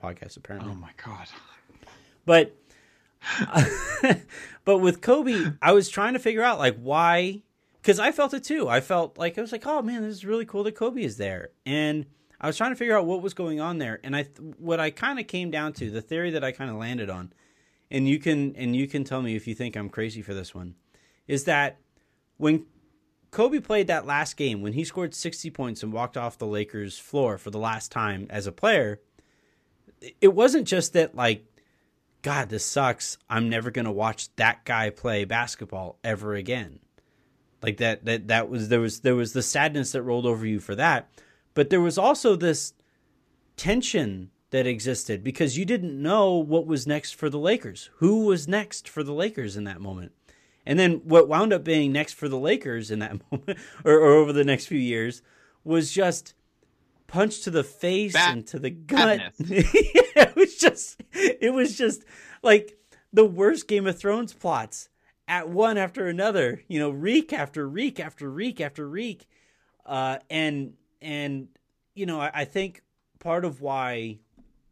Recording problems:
none

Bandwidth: 14.5 kHz